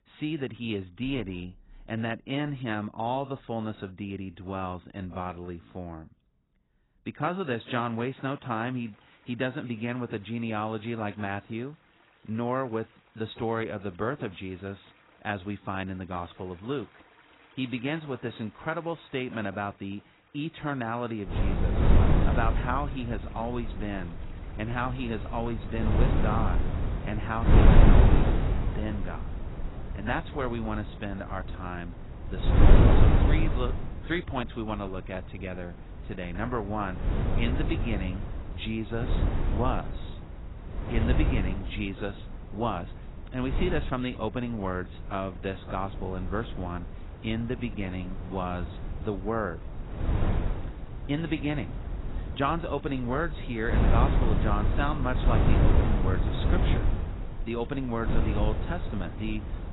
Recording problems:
garbled, watery; badly; nothing above 4 kHz
wind noise on the microphone; heavy; from 21 s on; 2 dB below the speech
rain or running water; faint; throughout; 25 dB below the speech

